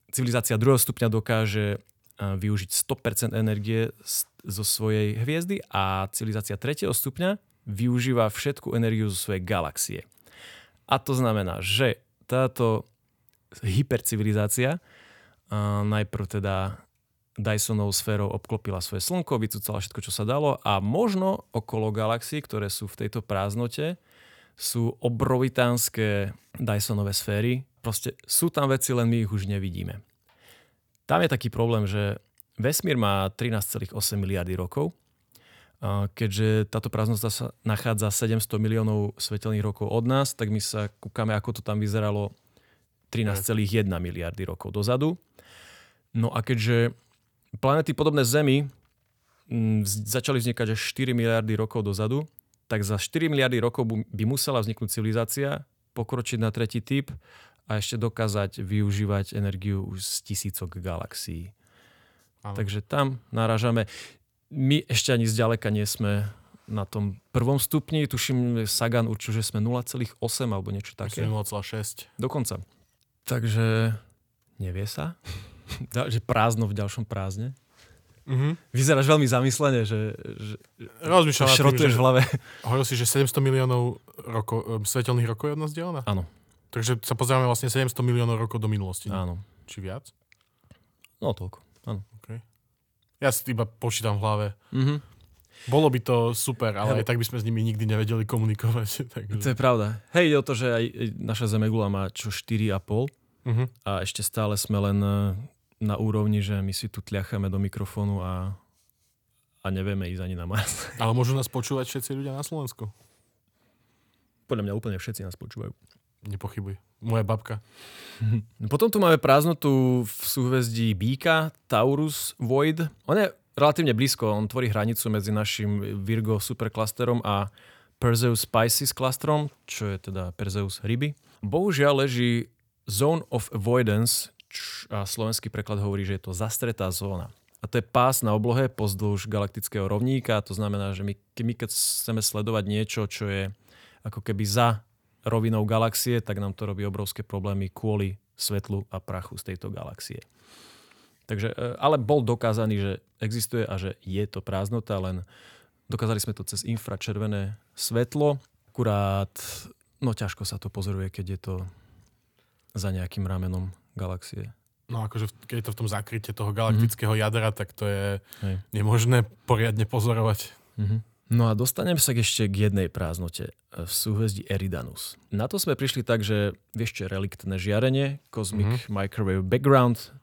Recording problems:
none

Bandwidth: 19 kHz